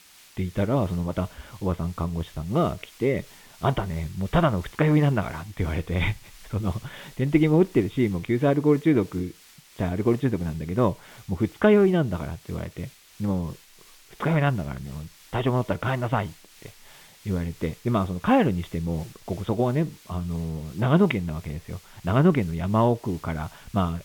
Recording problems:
high frequencies cut off; severe; nothing above 3.5 kHz
hiss; faint; throughout; 25 dB below the speech

